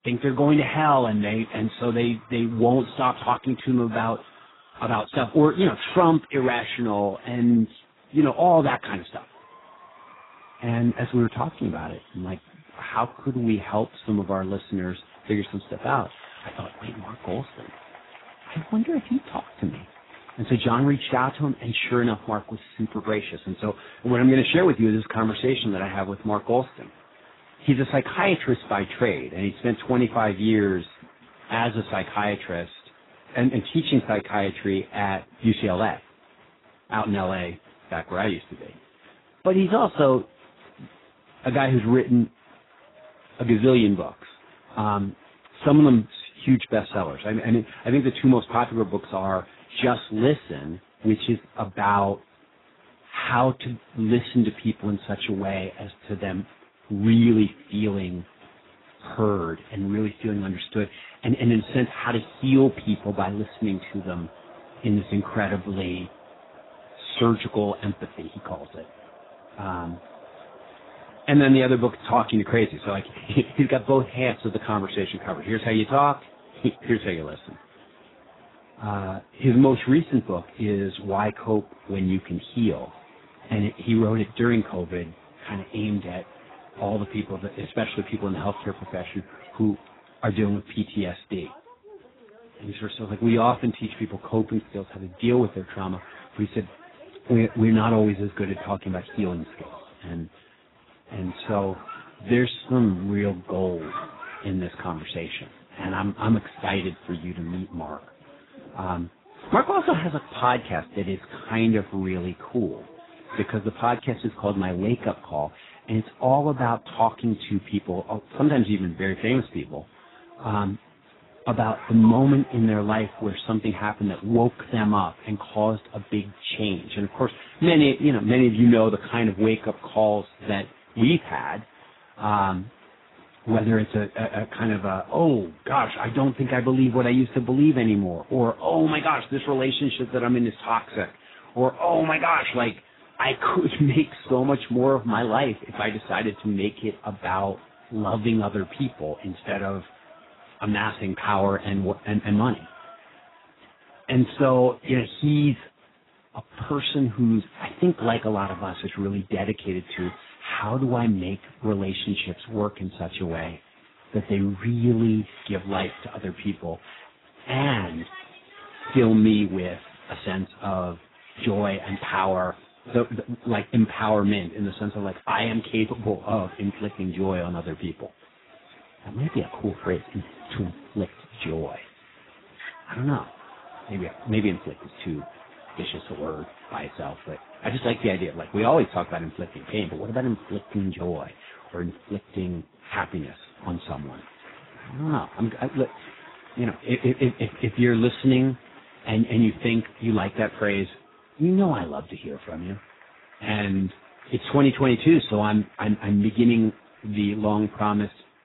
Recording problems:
garbled, watery; badly; nothing above 4 kHz
crowd noise; faint; throughout; 25 dB below the speech

